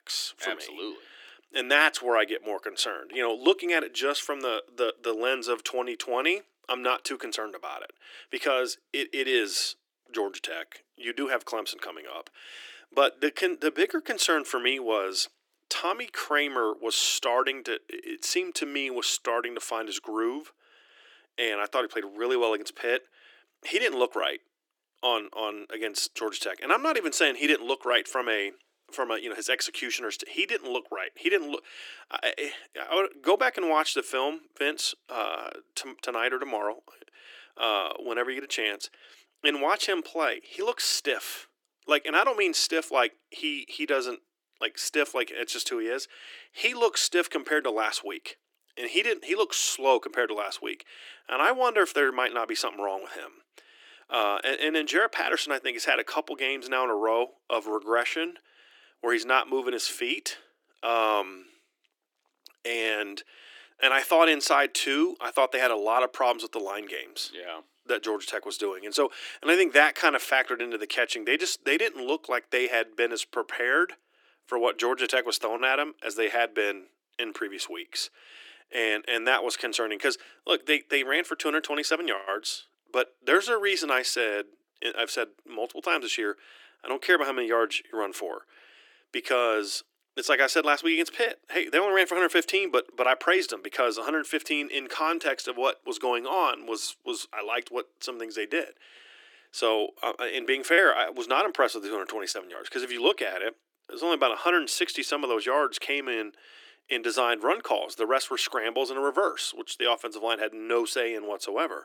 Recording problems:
thin; very; fading below 300 Hz

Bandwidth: 18 kHz